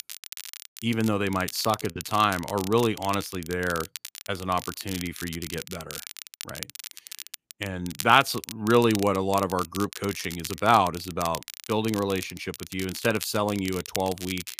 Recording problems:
crackle, like an old record; noticeable; 10 dB below the speech

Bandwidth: 15 kHz